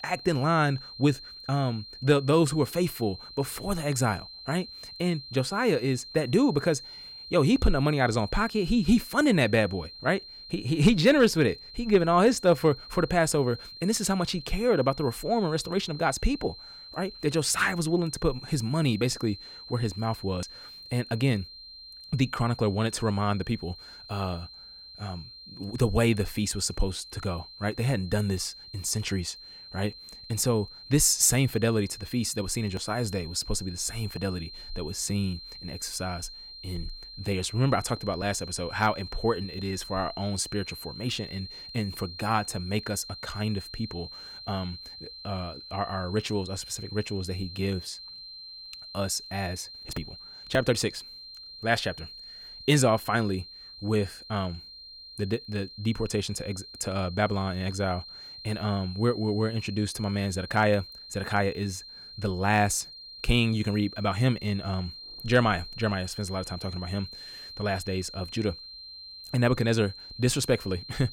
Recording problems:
high-pitched whine; noticeable; throughout; 4 kHz, 15 dB below the speech

